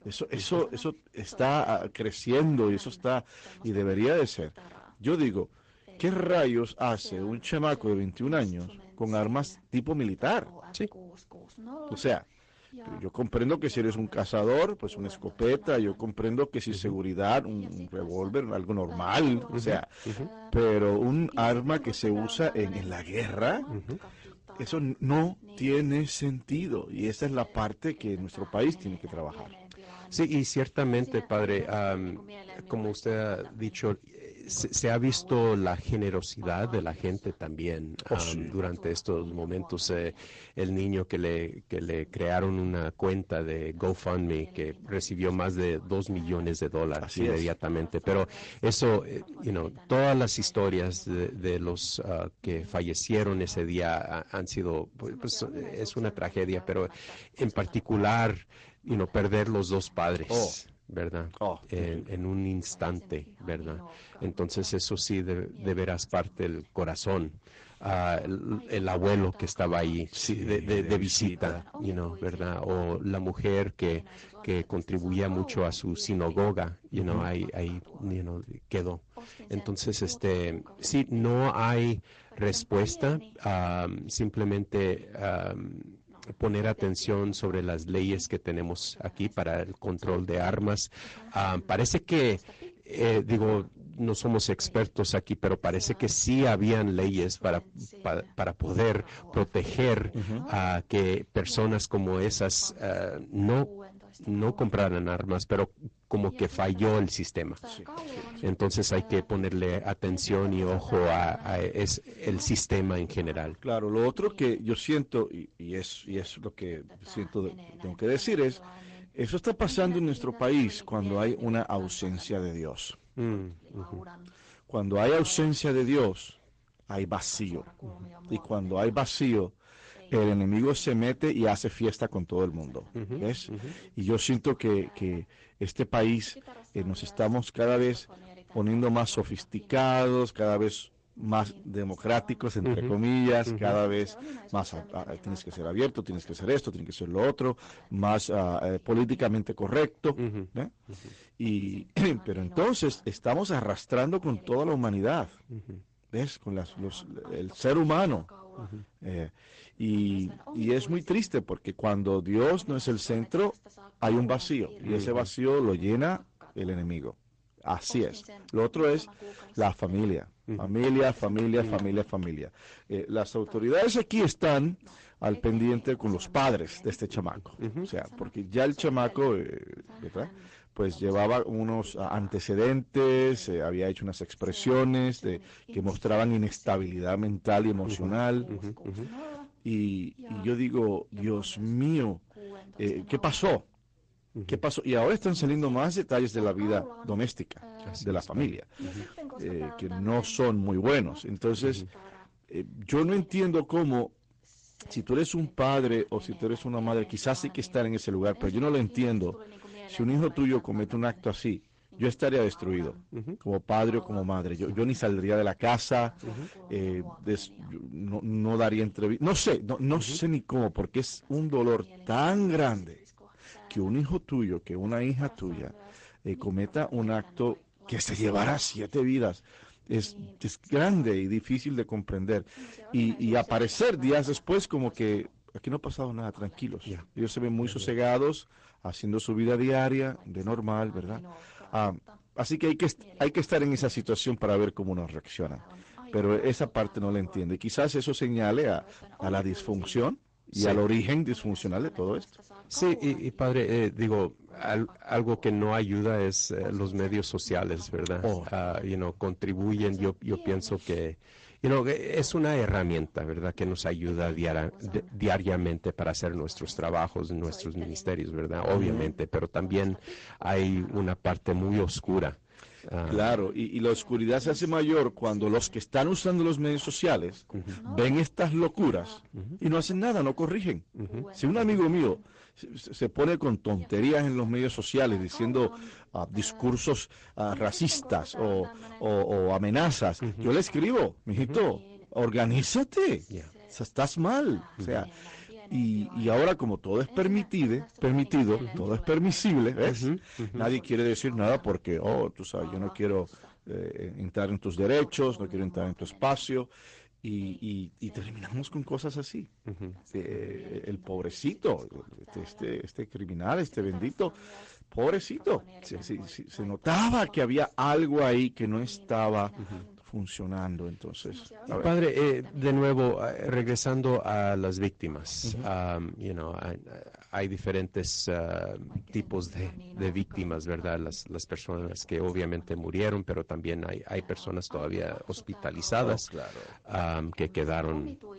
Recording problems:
distortion; slight; 5% of the sound clipped
garbled, watery; slightly; nothing above 8 kHz
voice in the background; faint; throughout; 20 dB below the speech

